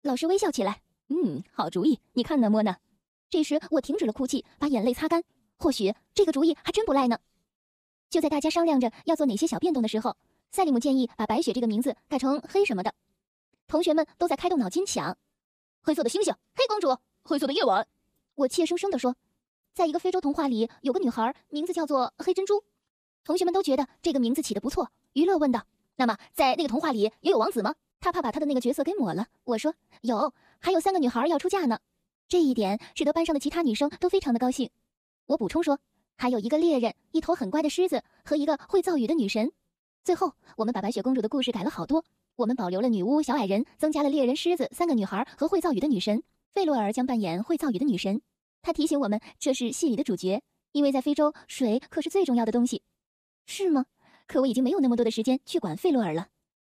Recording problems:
wrong speed, natural pitch; too fast; 1.8 times normal speed

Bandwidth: 14.5 kHz